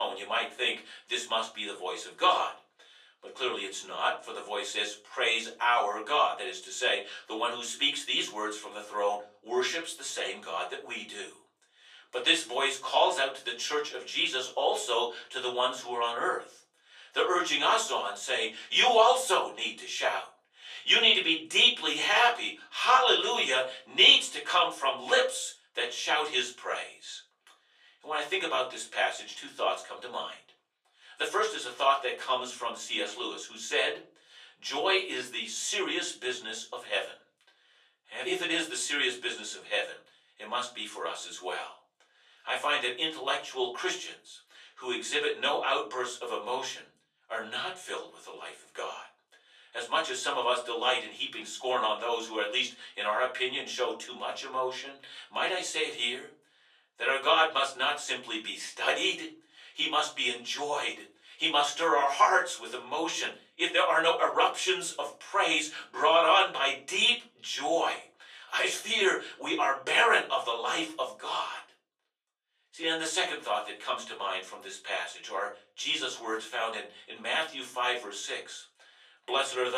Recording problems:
off-mic speech; far
thin; very; fading below 550 Hz
room echo; very slight; dies away in 0.3 s
abrupt cut into speech; at the start and the end

